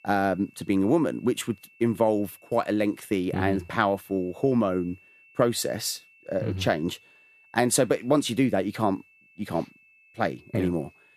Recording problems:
high-pitched whine; faint; throughout; 2.5 kHz, 30 dB below the speech

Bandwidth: 14.5 kHz